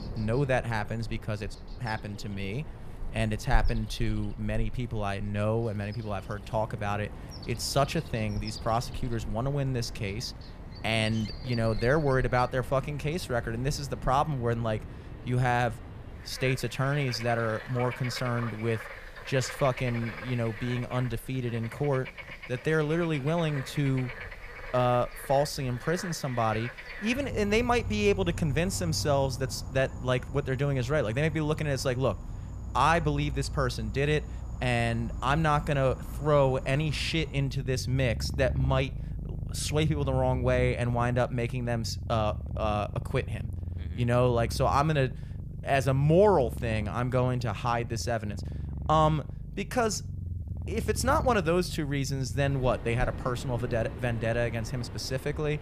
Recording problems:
animal sounds; noticeable; throughout; 10 dB below the speech

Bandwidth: 14.5 kHz